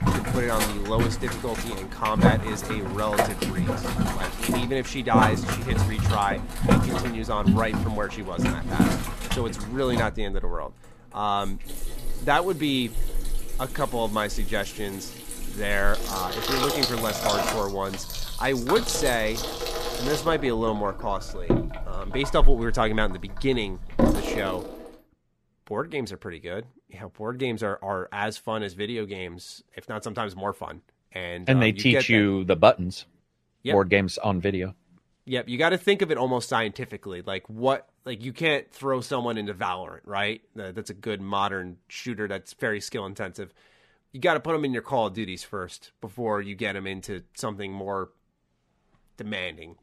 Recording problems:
household noises; loud; until 24 s; 1 dB below the speech

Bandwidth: 14.5 kHz